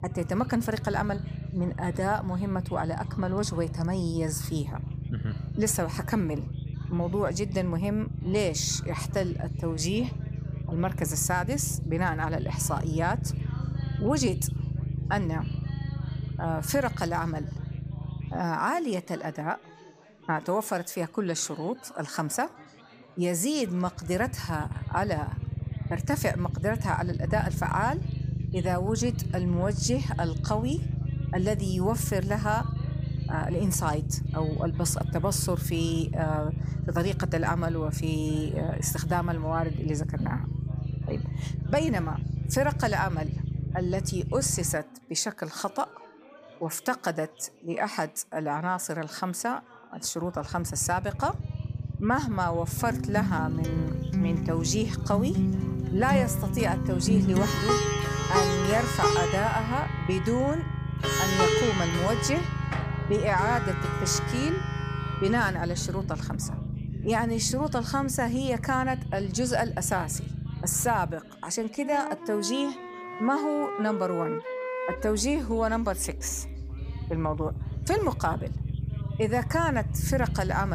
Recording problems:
background music; loud; from 53 s on; 2 dB below the speech
low rumble; noticeable; throughout; 15 dB below the speech
background chatter; faint; throughout; 4 voices, 20 dB below the speech
abrupt cut into speech; at the end

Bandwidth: 15 kHz